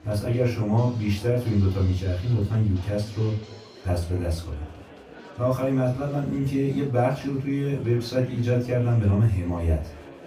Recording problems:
off-mic speech; far
room echo; slight; dies away in 0.3 s
background music; faint; throughout; 25 dB below the speech
chatter from many people; faint; throughout; 20 dB below the speech

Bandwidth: 15.5 kHz